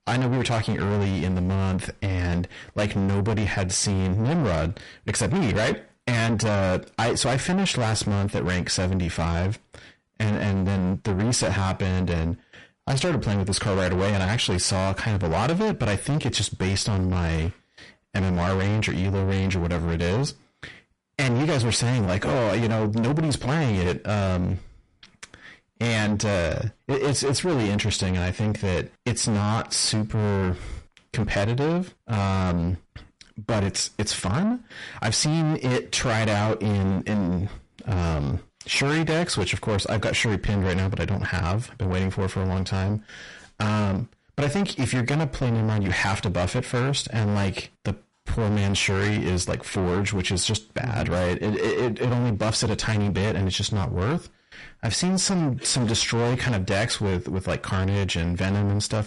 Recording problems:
distortion; heavy; 6 dB below the speech
garbled, watery; slightly; nothing above 10.5 kHz

